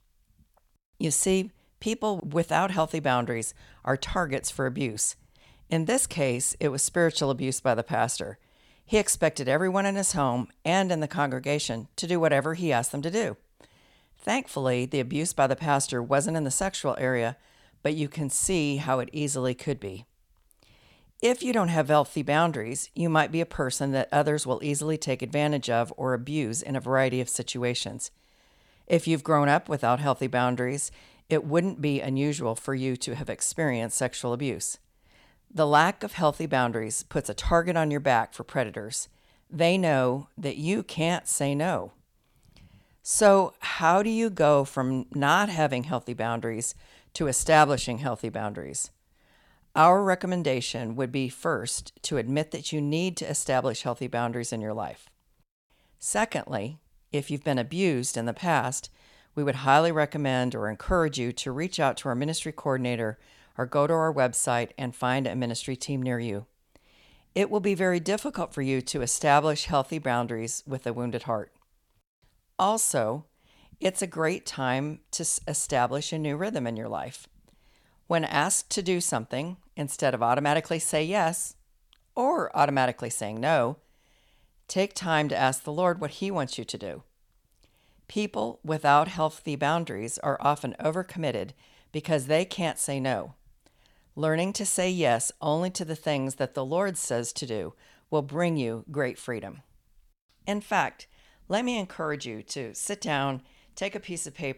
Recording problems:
none

